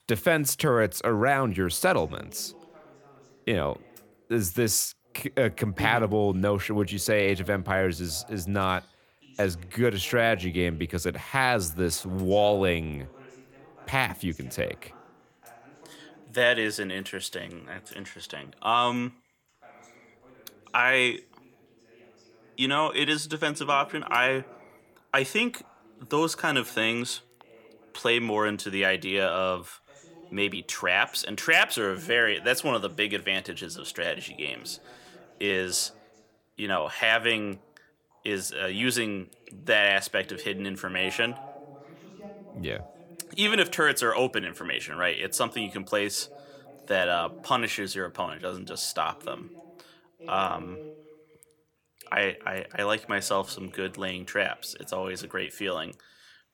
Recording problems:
voice in the background; faint; throughout; 25 dB below the speech

